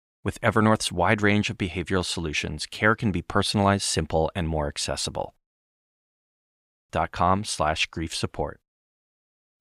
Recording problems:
audio freezing; at 5.5 s for 1.5 s

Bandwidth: 15 kHz